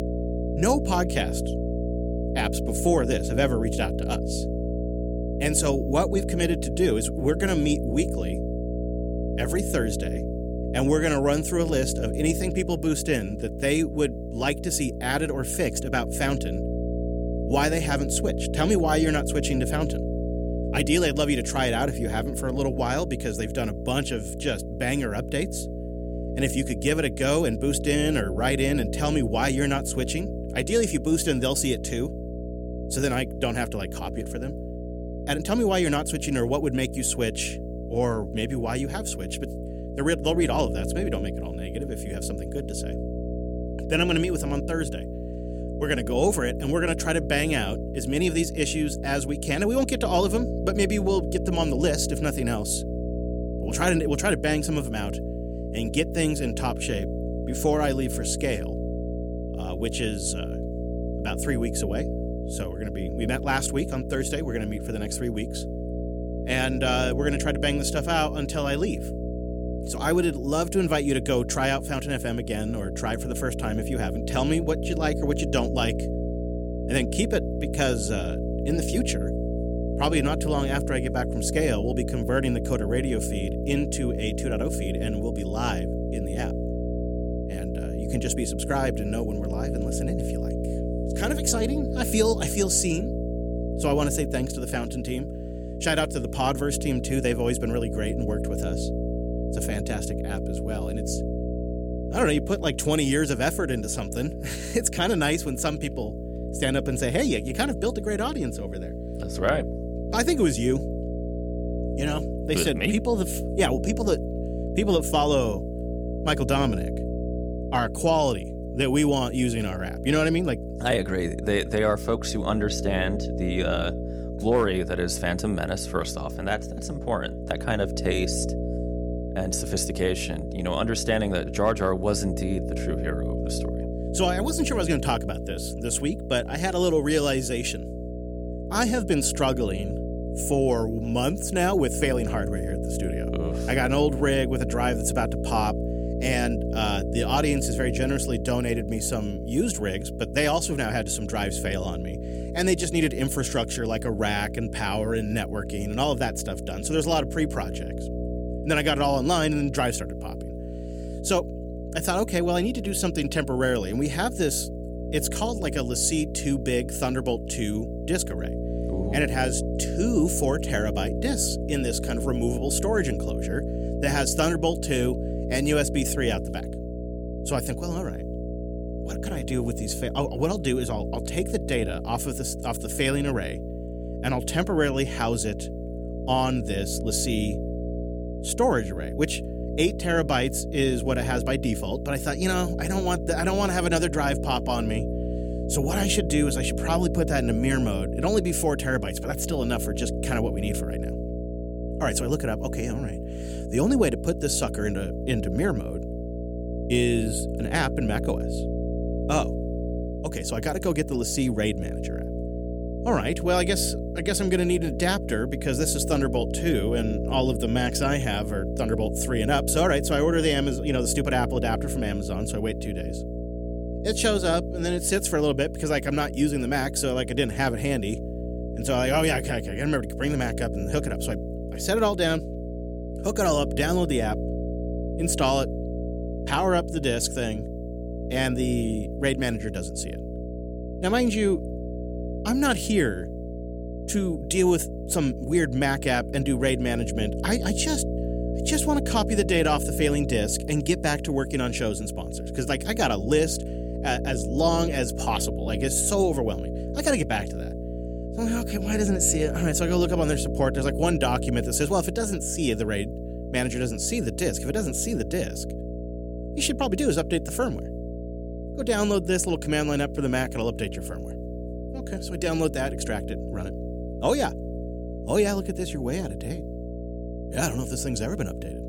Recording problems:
electrical hum; loud; throughout; 60 Hz, 9 dB below the speech

